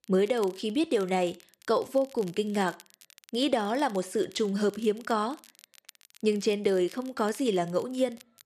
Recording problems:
crackle, like an old record; faint; 25 dB below the speech

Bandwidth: 13.5 kHz